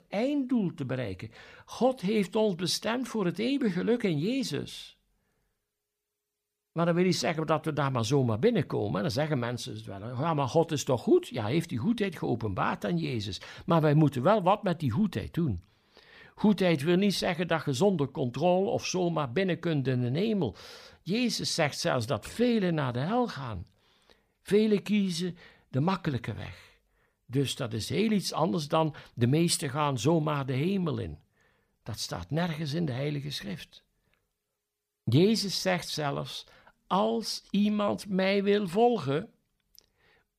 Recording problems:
none

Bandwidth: 15 kHz